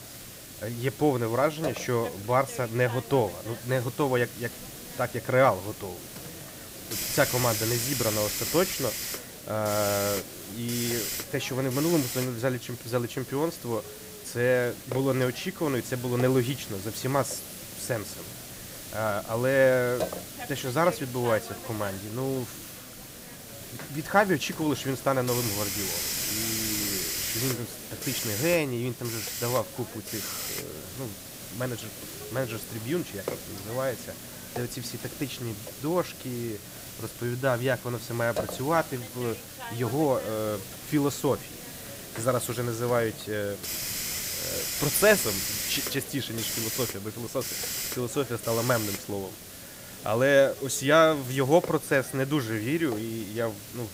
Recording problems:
hiss; loud; throughout; 6 dB below the speech

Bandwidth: 15.5 kHz